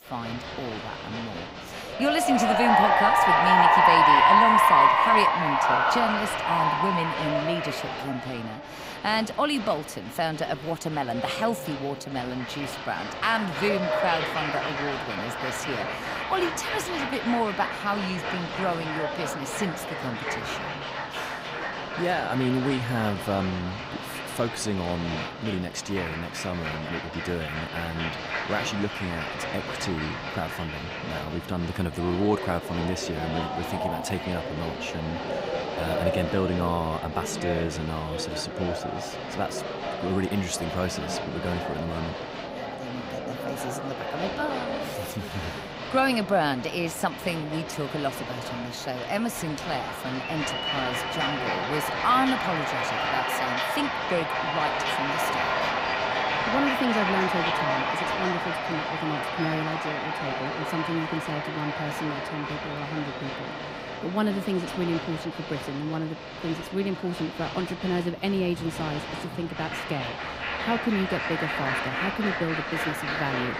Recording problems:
crowd noise; very loud; throughout; 2 dB above the speech

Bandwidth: 15.5 kHz